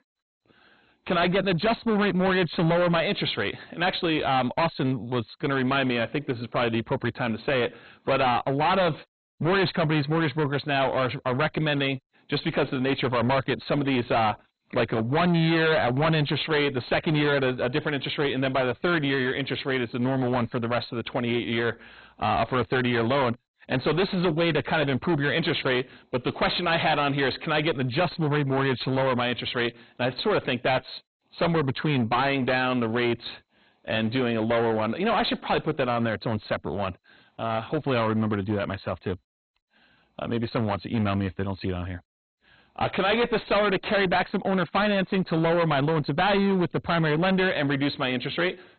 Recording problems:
distortion; heavy; 20% of the sound clipped
garbled, watery; badly; nothing above 4 kHz

